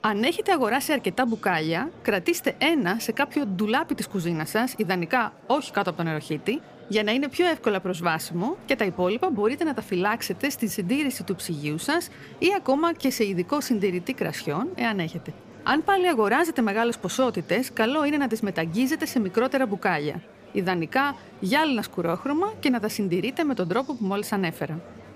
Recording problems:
murmuring crowd; faint; throughout; 20 dB below the speech

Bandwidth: 15 kHz